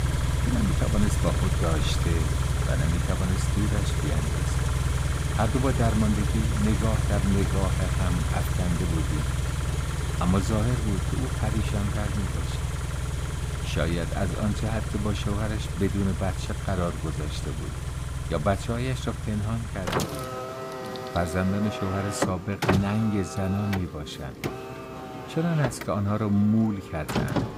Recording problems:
traffic noise; loud; throughout; as loud as the speech

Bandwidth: 15.5 kHz